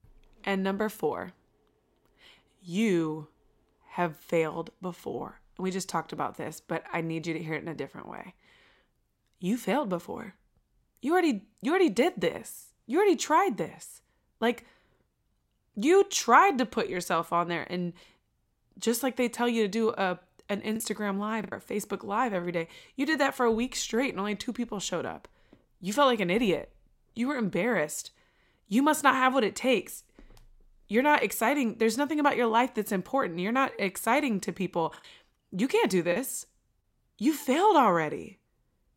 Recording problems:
choppy; very; at 21 s and from 35 to 36 s; 6% of the speech affected

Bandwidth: 16 kHz